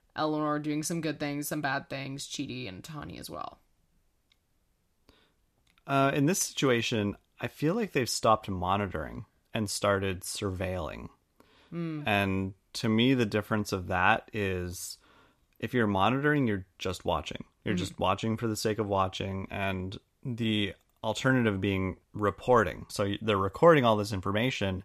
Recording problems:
none

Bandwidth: 14.5 kHz